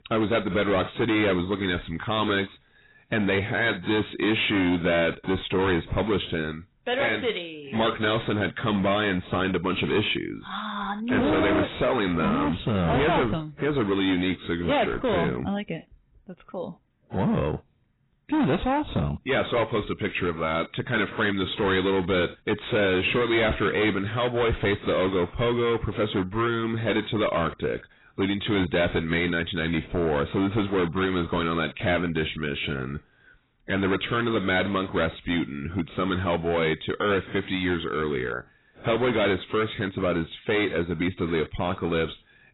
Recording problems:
distortion; heavy; 15% of the sound clipped
garbled, watery; badly; nothing above 4 kHz

